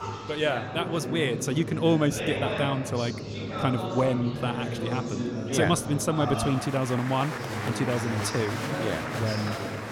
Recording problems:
chatter from many people; loud; throughout; 4 dB below the speech

